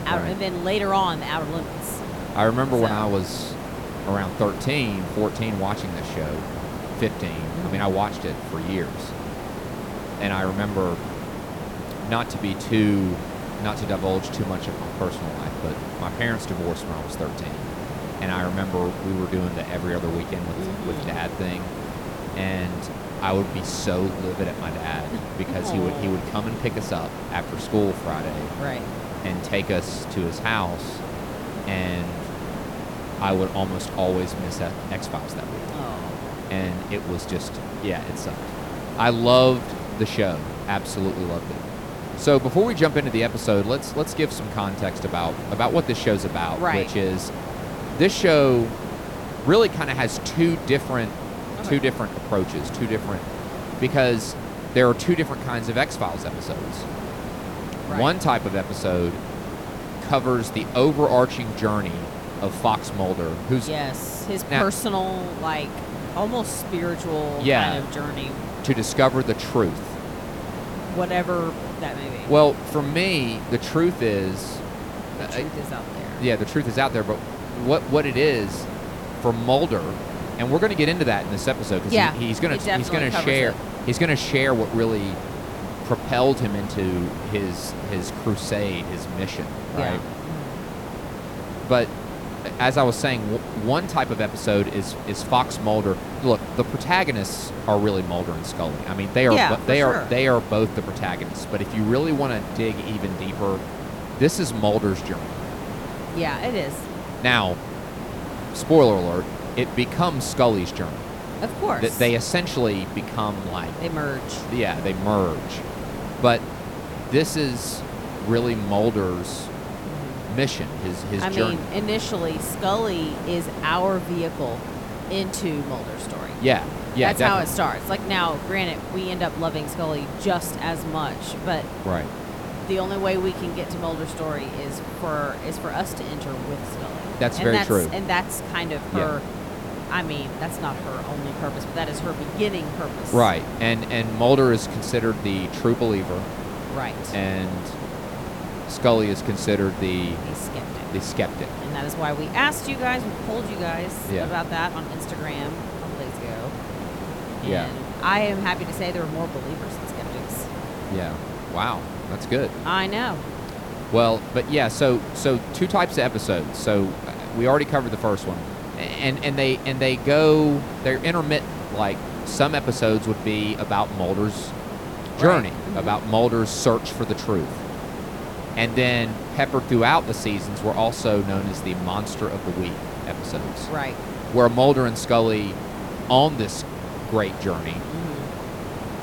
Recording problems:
hiss; loud; throughout; 8 dB below the speech

